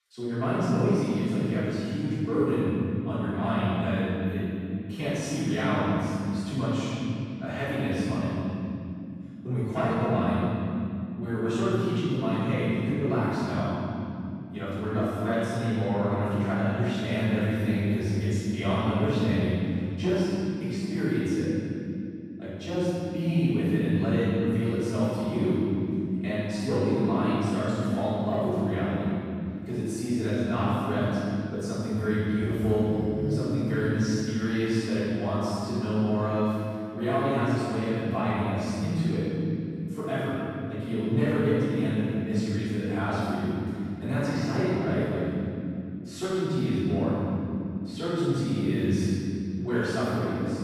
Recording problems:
room echo; strong; dies away in 2.9 s
off-mic speech; far

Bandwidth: 14.5 kHz